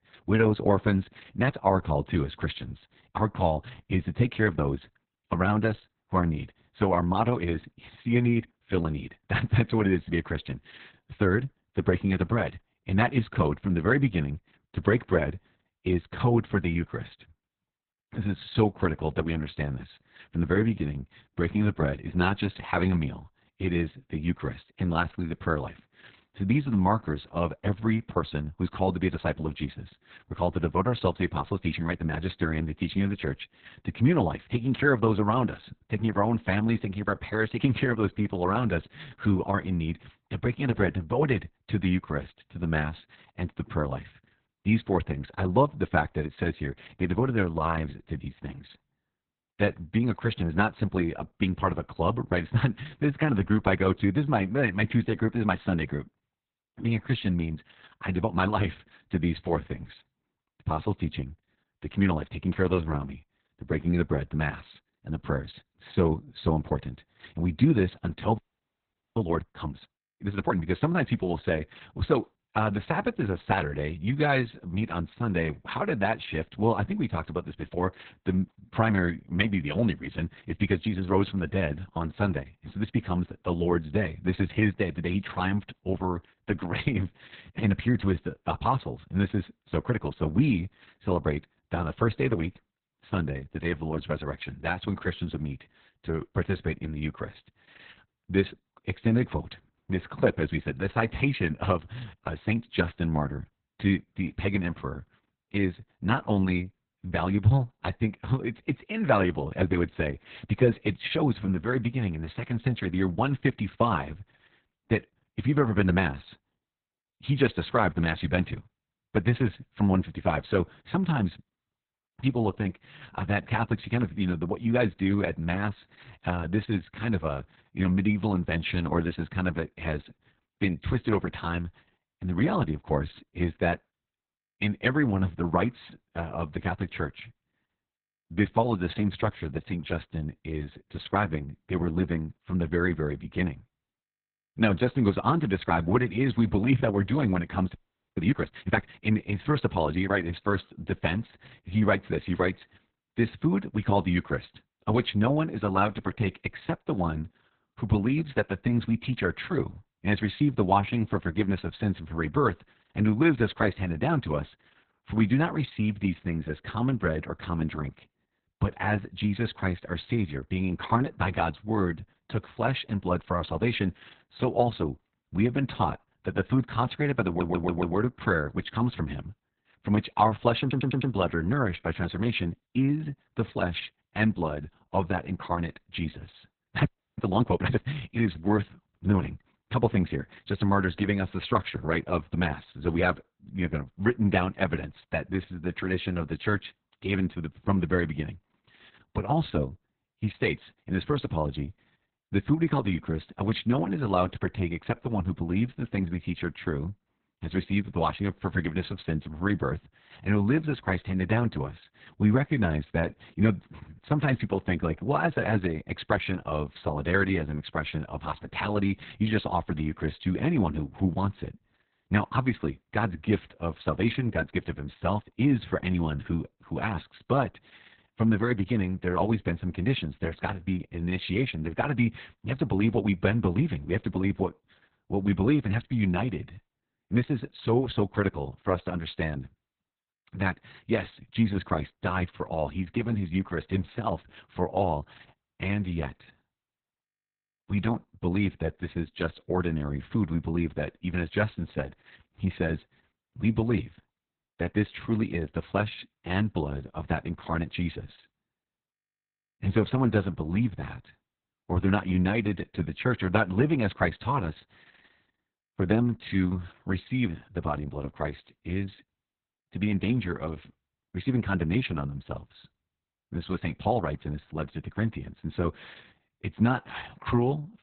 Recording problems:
garbled, watery; badly; nothing above 4 kHz
audio freezing; at 1:08 for 1 s, at 2:28 and at 3:07
audio stuttering; at 2:57 and at 3:01

